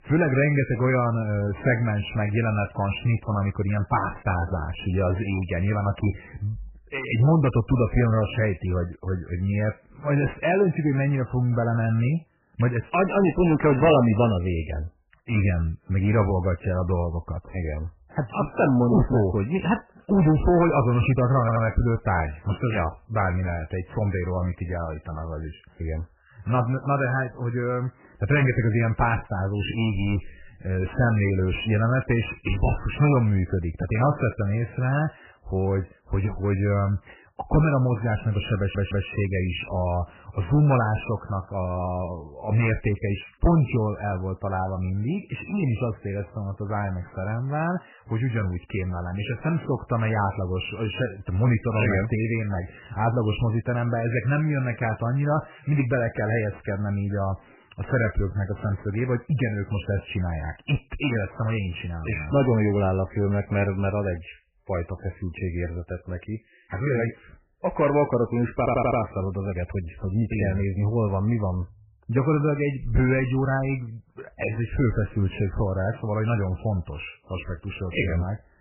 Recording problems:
garbled, watery; badly; nothing above 3 kHz
distortion; slight; 10 dB below the speech
audio stuttering; at 21 s, at 39 s and at 1:09

